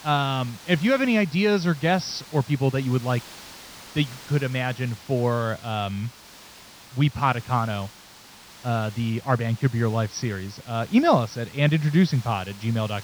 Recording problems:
high frequencies cut off; noticeable; nothing above 6 kHz
hiss; noticeable; throughout; 20 dB below the speech

